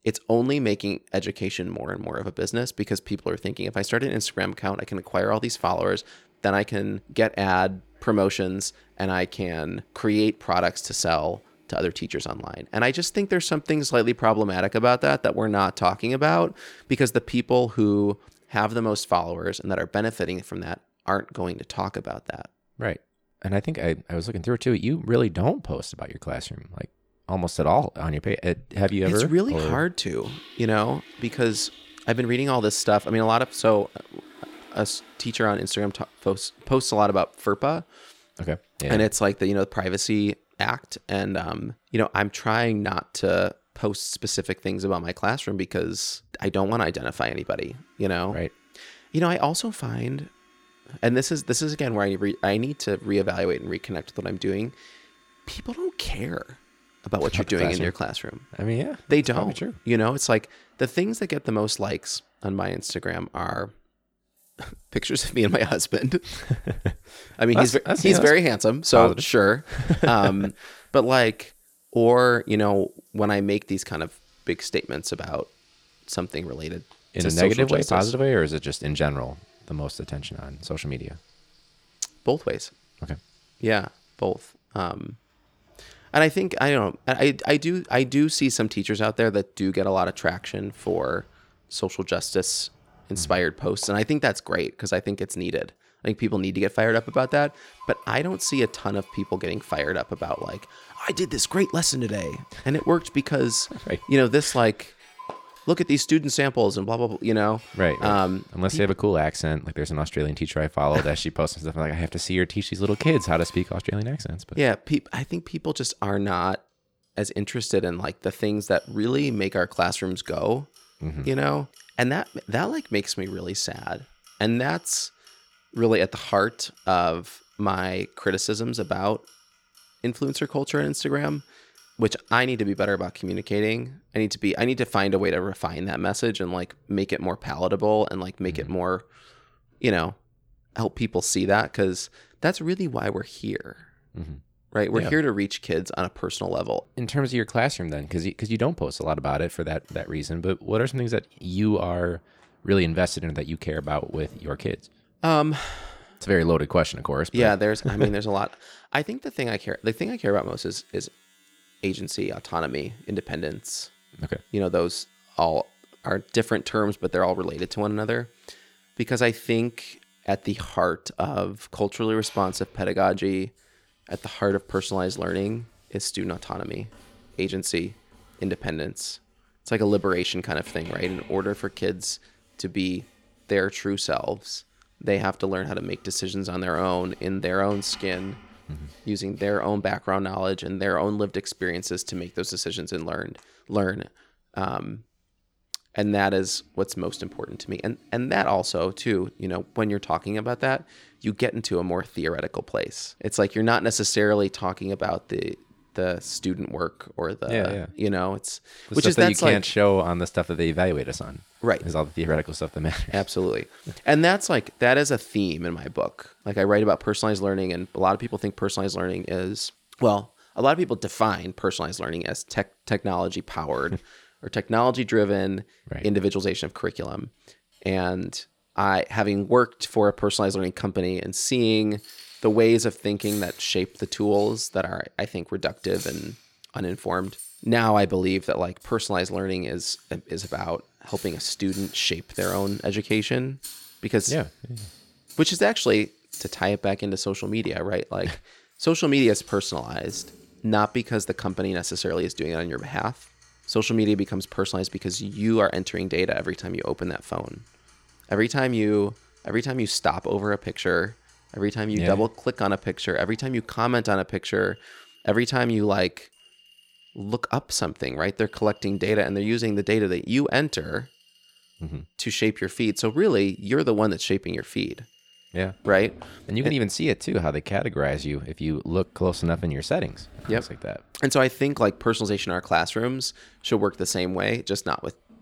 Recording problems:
household noises; faint; throughout; 25 dB below the speech

